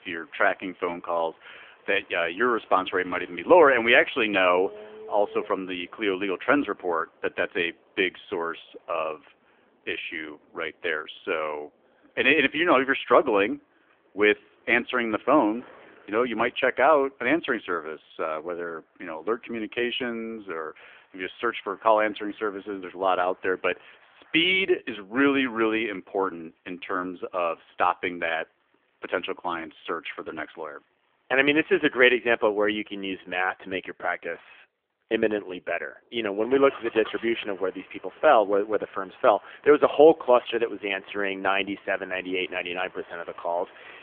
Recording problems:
phone-call audio; nothing above 3.5 kHz
traffic noise; faint; throughout; 25 dB below the speech

